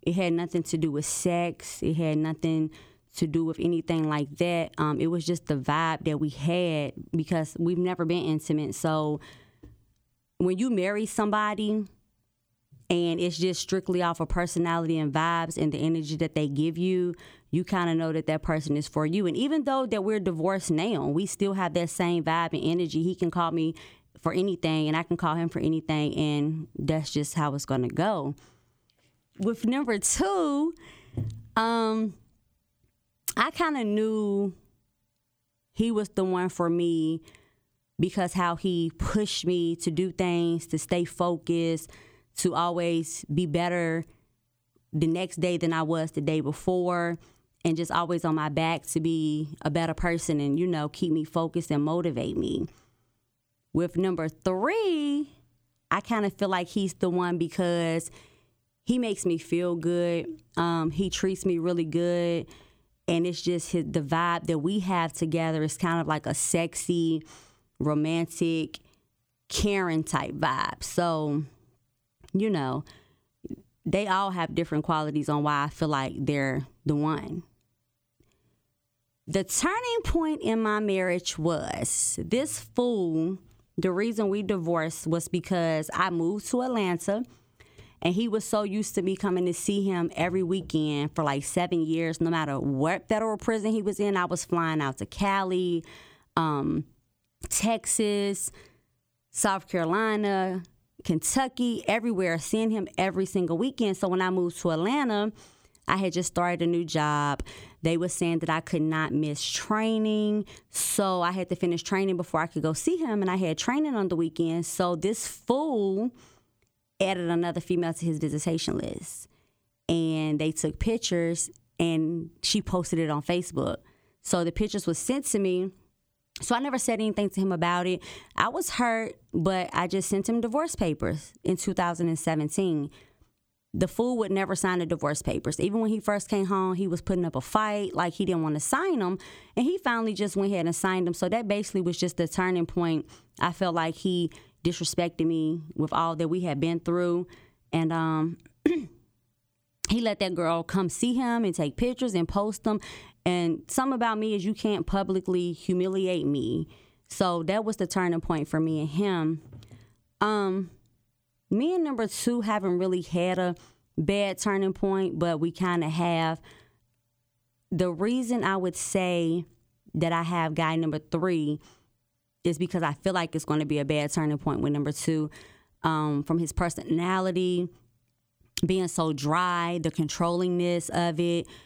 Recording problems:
squashed, flat; somewhat

